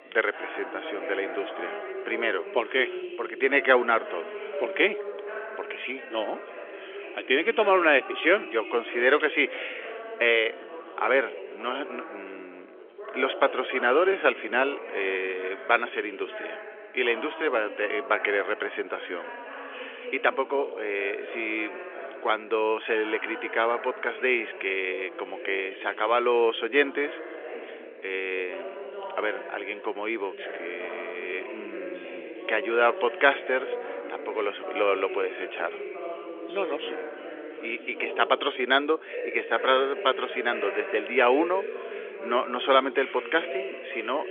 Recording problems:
thin; very; fading below 400 Hz
phone-call audio; nothing above 3.5 kHz
background chatter; noticeable; throughout; 3 voices, 10 dB below the speech

